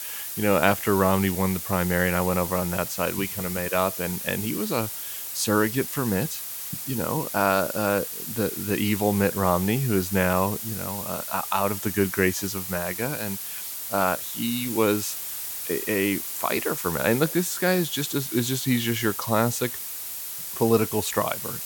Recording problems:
hiss; loud; throughout; 5 dB below the speech

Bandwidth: 17 kHz